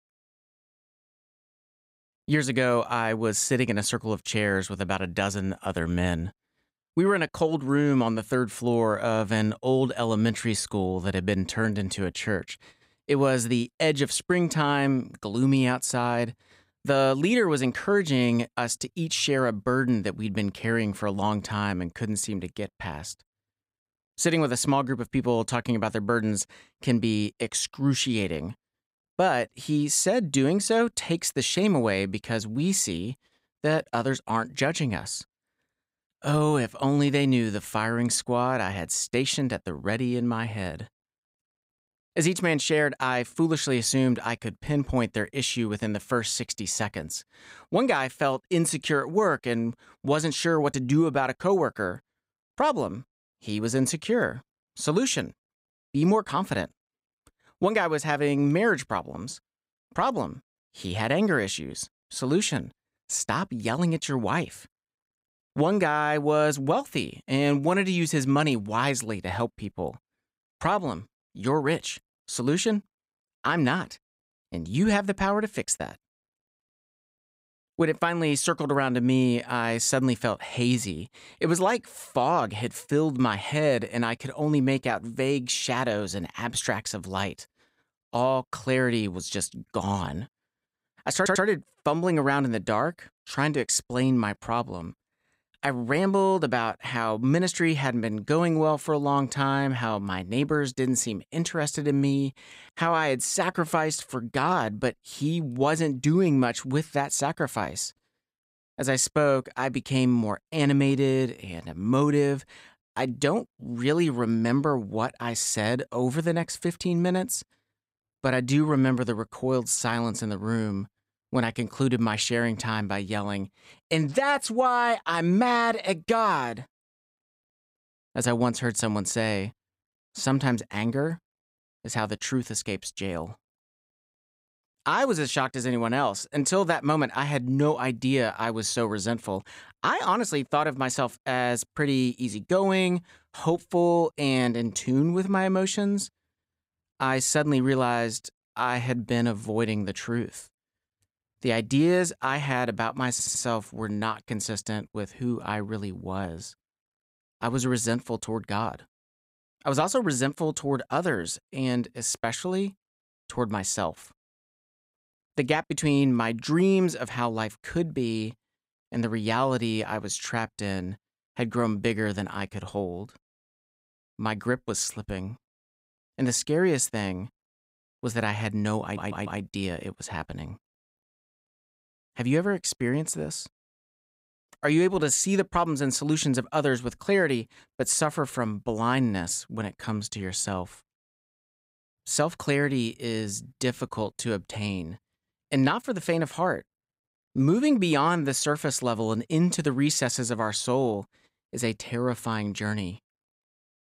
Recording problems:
audio stuttering; at 1:31, at 2:33 and at 2:59

